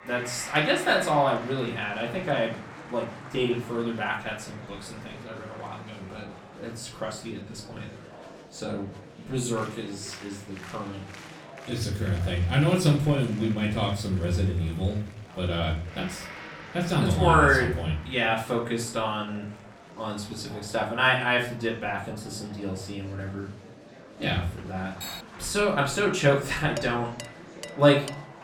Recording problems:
off-mic speech; far
room echo; slight; dies away in 0.4 s
background music; noticeable; throughout; 20 dB below the speech
murmuring crowd; noticeable; throughout; 20 dB below the speech
clattering dishes; faint; at 25 s and from 27 s on; peak 10 dB below the speech

